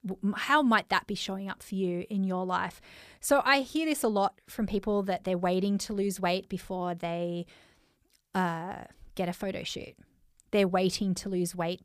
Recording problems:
none

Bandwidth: 15 kHz